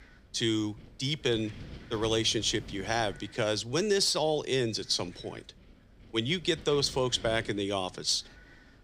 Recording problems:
wind noise on the microphone; occasional gusts; 25 dB below the speech

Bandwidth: 15.5 kHz